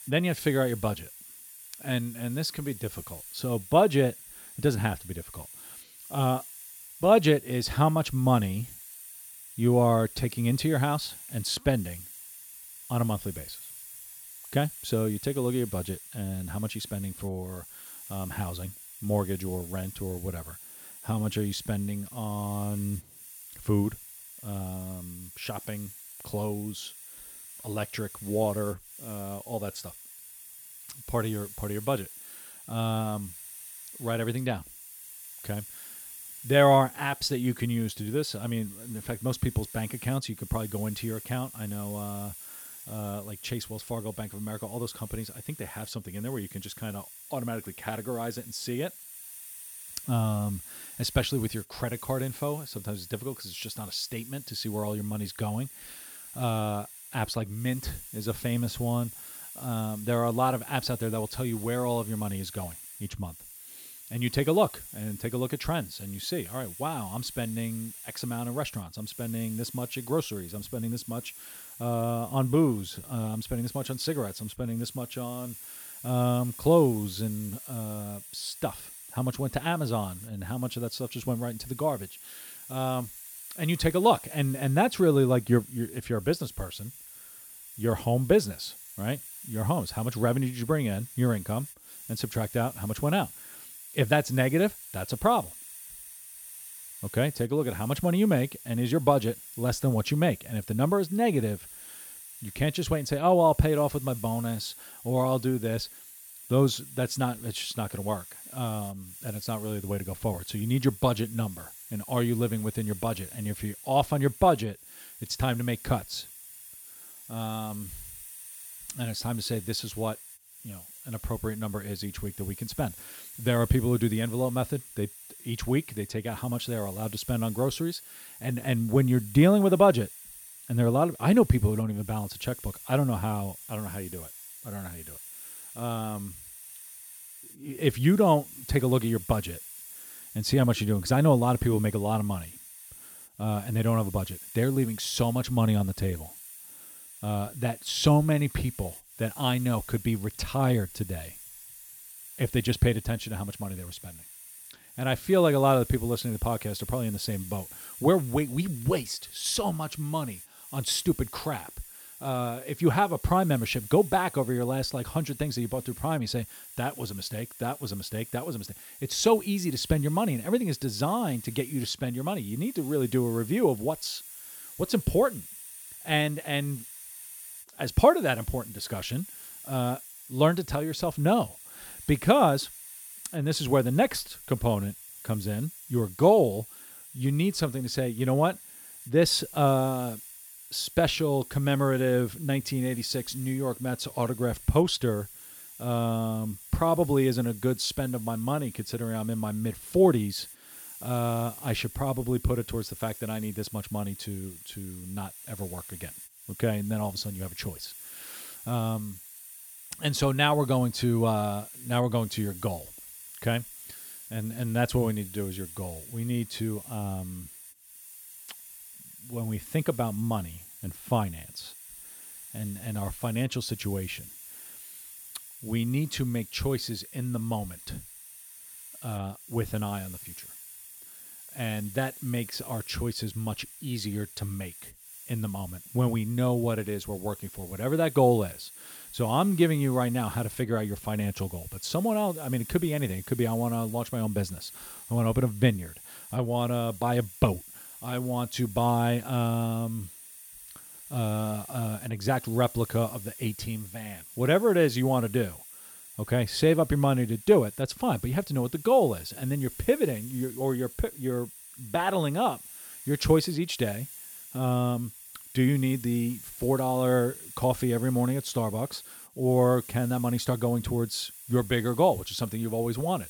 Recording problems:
hiss; noticeable; throughout; 15 dB below the speech

